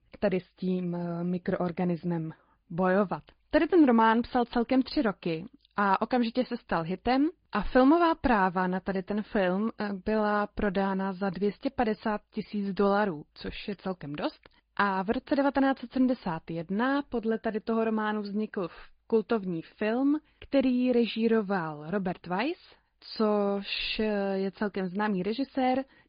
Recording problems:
high frequencies cut off; severe; nothing above 5 kHz
garbled, watery; slightly

